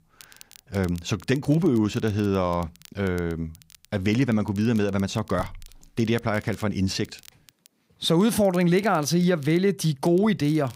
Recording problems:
crackle, like an old record; faint; 25 dB below the speech

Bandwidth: 15.5 kHz